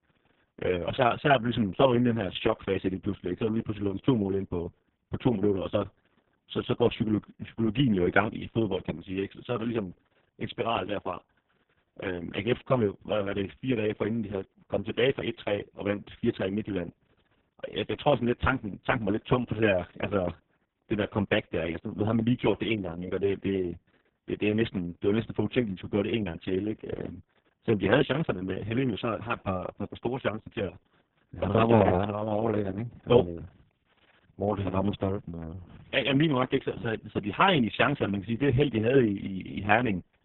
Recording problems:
garbled, watery; badly
high frequencies cut off; severe; nothing above 3.5 kHz

